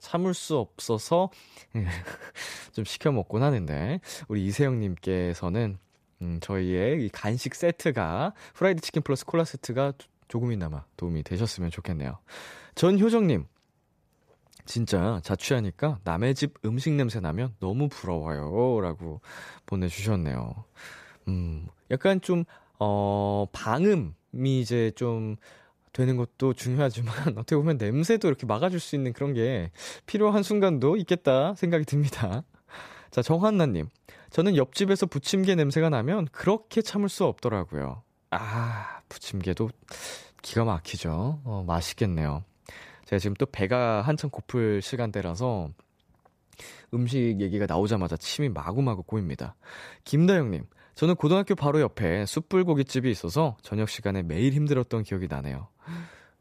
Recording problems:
none

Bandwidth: 14.5 kHz